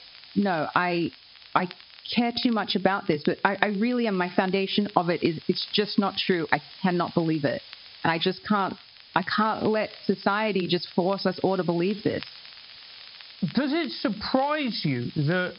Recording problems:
high frequencies cut off; noticeable; nothing above 5.5 kHz
squashed, flat; somewhat
hiss; noticeable; throughout; 20 dB below the speech
crackle, like an old record; faint; 25 dB below the speech

